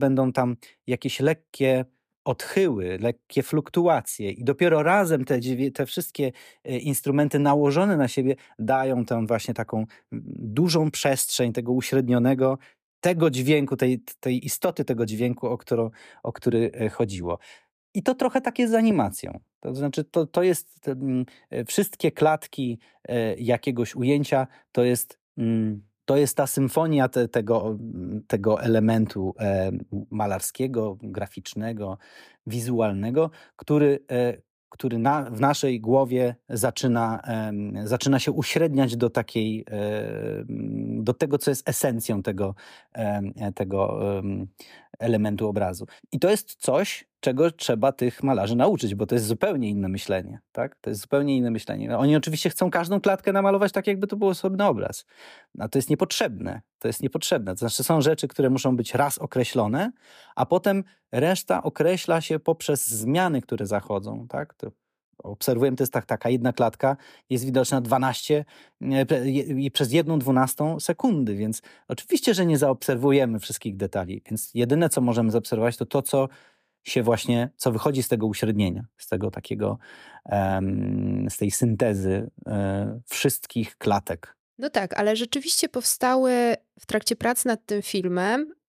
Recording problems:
abrupt cut into speech; at the start

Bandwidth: 15 kHz